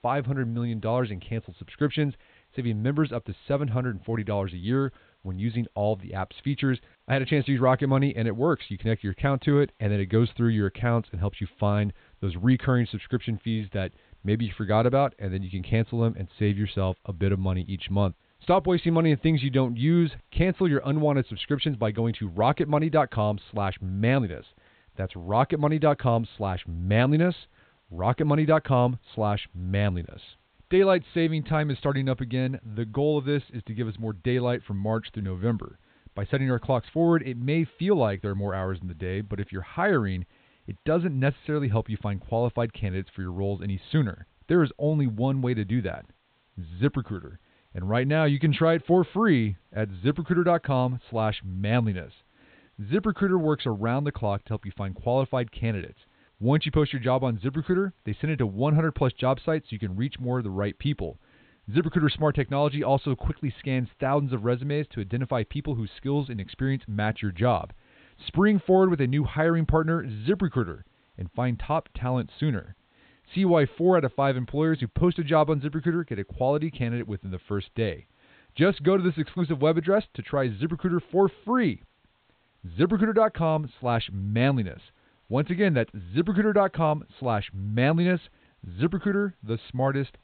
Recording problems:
high frequencies cut off; severe; nothing above 4 kHz
hiss; very faint; throughout; 40 dB below the speech

